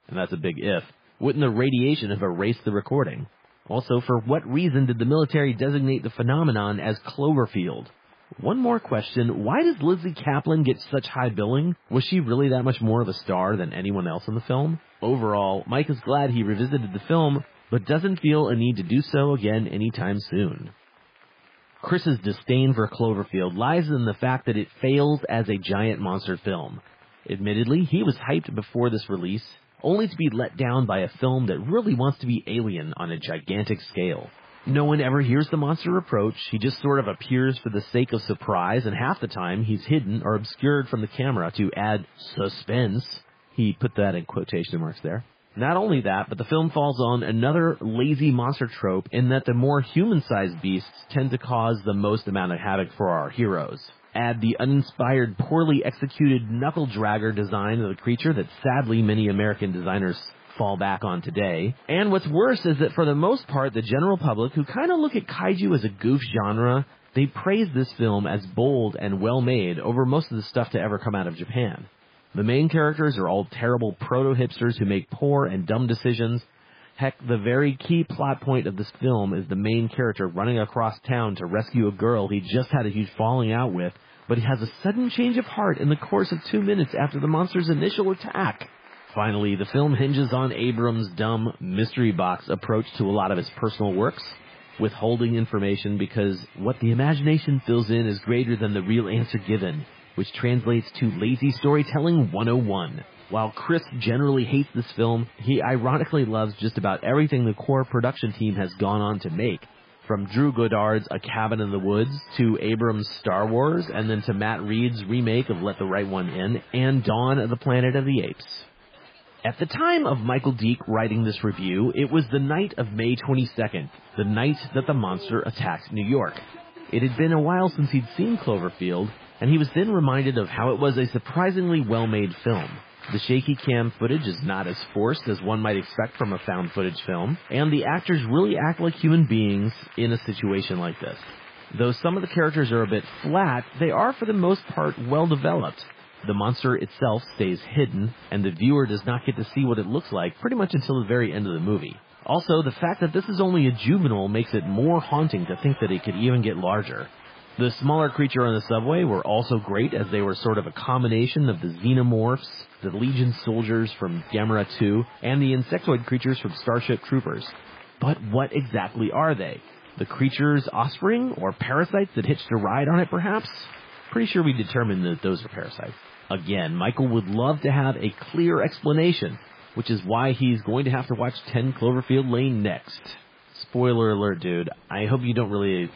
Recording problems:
garbled, watery; badly; nothing above 5 kHz
crowd noise; faint; throughout; 25 dB below the speech

